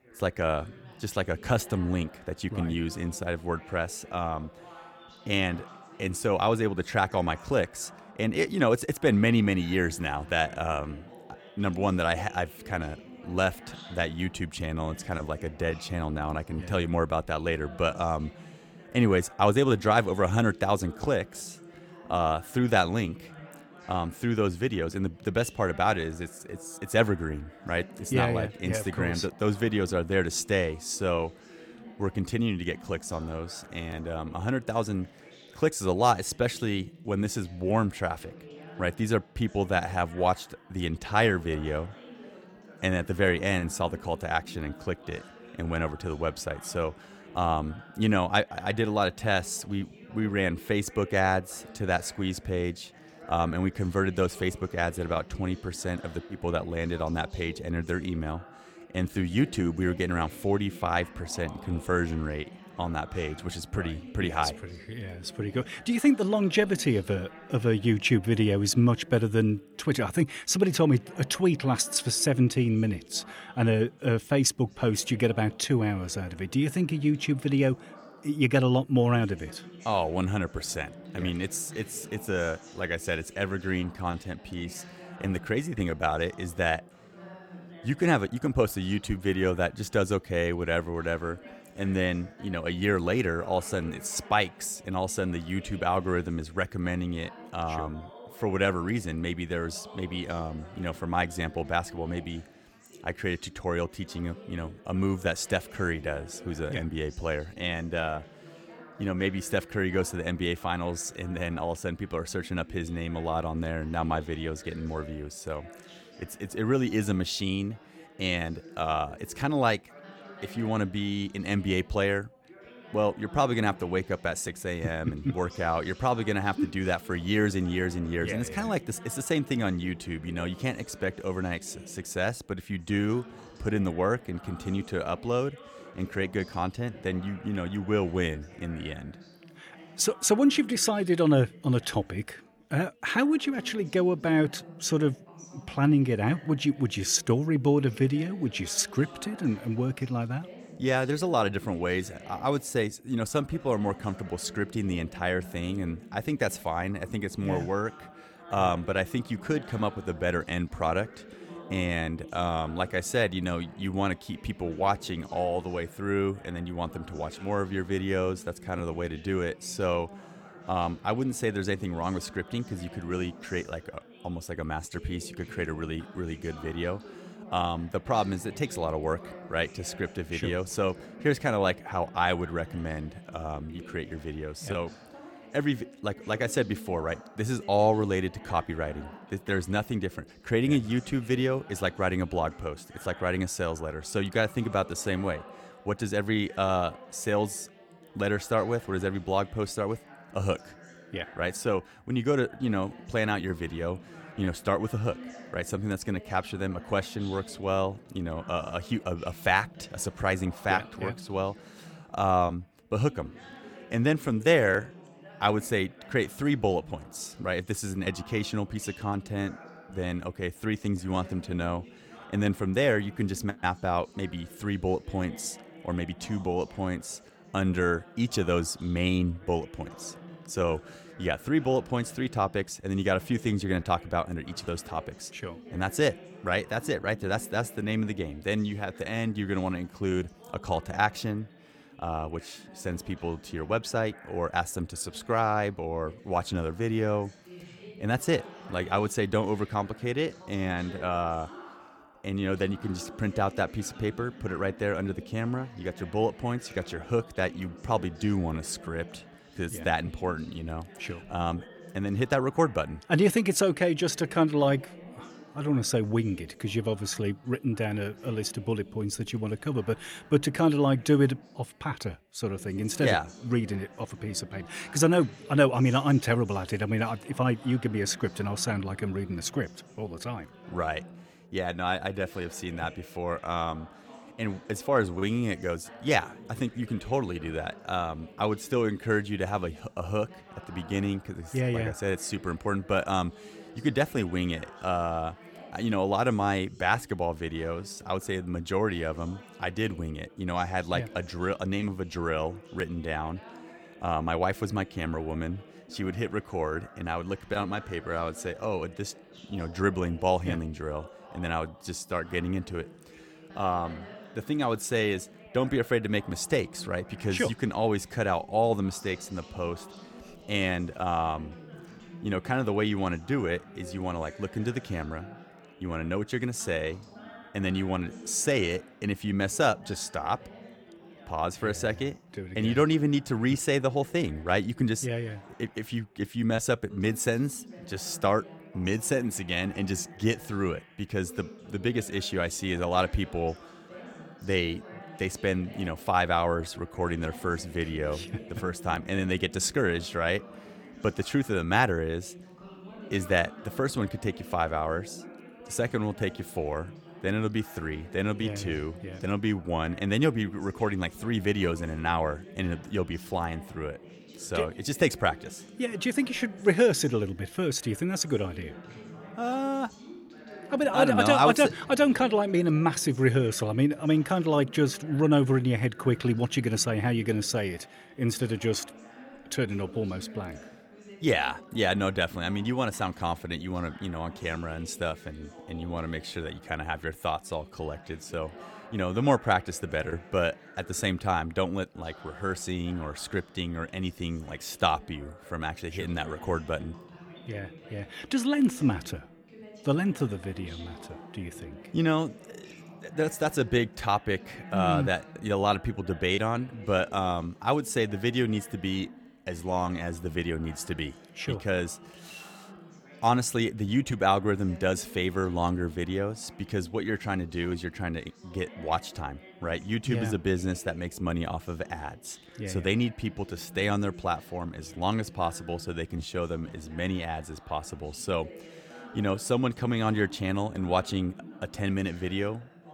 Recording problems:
background chatter; noticeable; throughout; 3 voices, 20 dB below the speech

